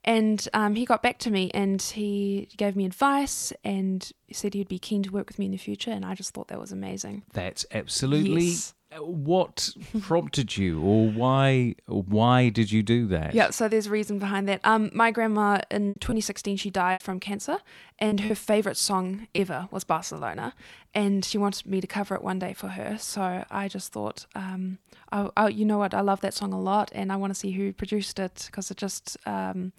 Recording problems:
choppy; very; from 16 to 19 s; 8% of the speech affected

